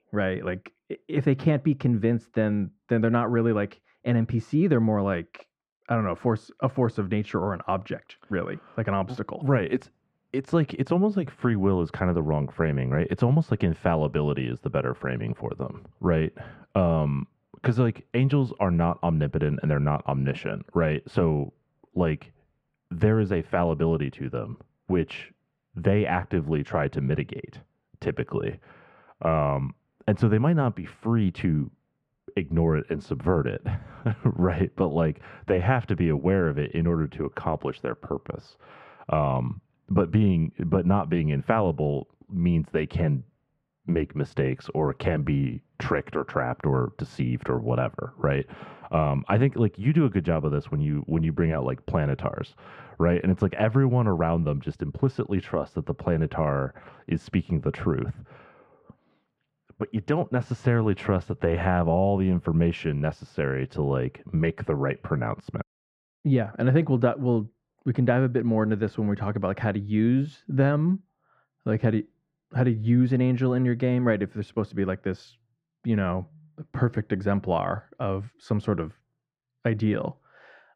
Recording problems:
muffled; very; fading above 3.5 kHz

